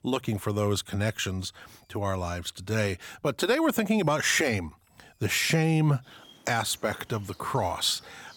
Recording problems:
animal sounds; faint; throughout; 25 dB below the speech

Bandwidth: 18 kHz